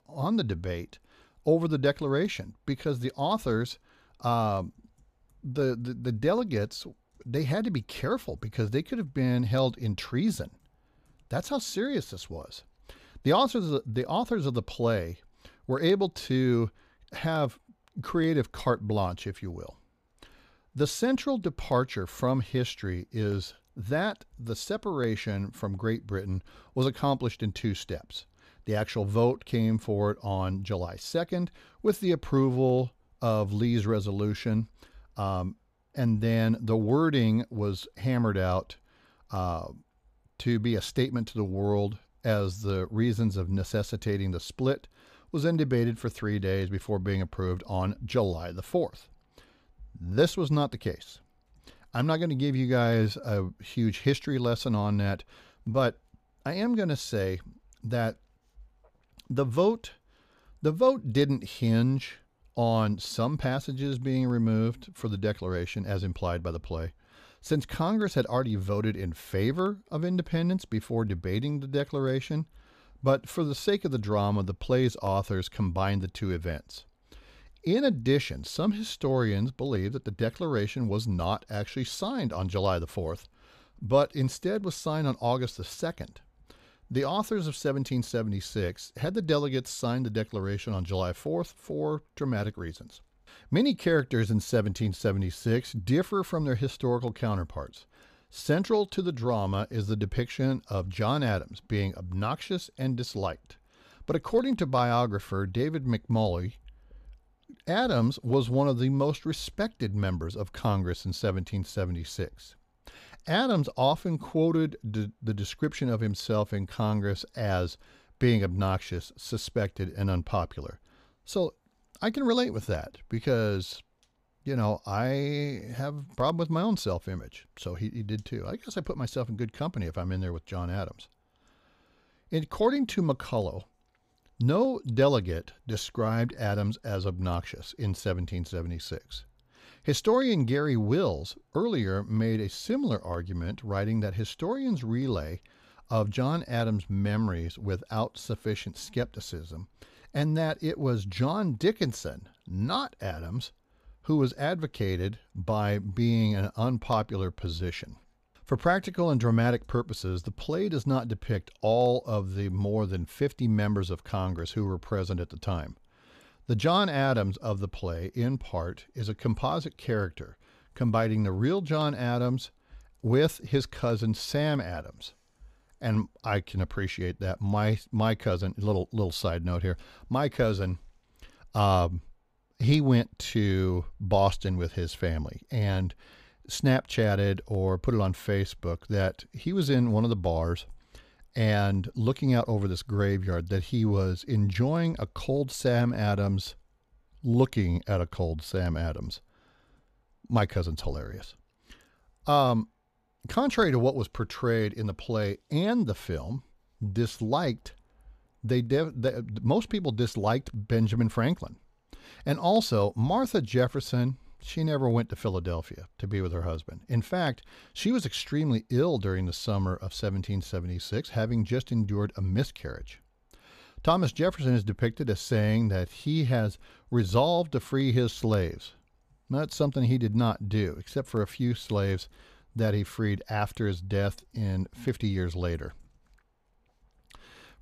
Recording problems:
none

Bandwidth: 14.5 kHz